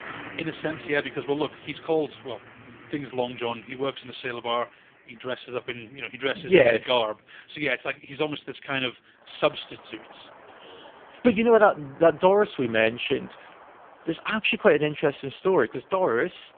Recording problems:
phone-call audio; poor line
traffic noise; faint; throughout; 20 dB below the speech

